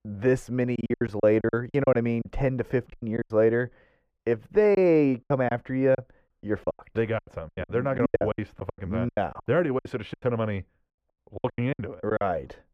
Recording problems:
muffled; very; fading above 2 kHz
choppy; very; 18% of the speech affected

